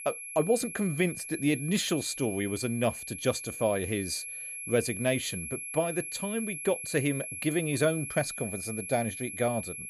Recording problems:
high-pitched whine; loud; throughout; 11 kHz, 7 dB below the speech

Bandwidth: 15.5 kHz